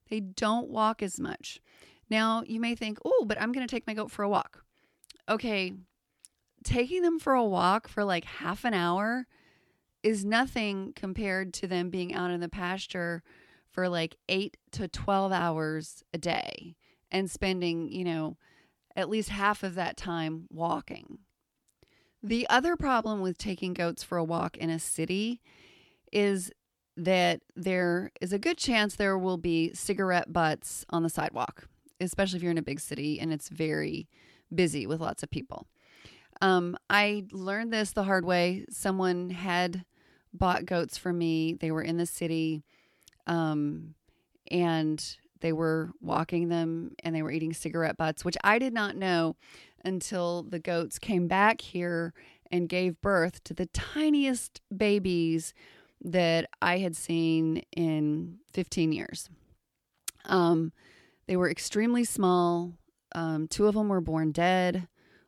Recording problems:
none

